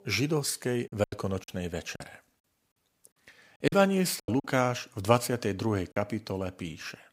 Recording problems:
choppy; very; from 1 to 4.5 s and at 6 s; 11% of the speech affected

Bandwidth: 15.5 kHz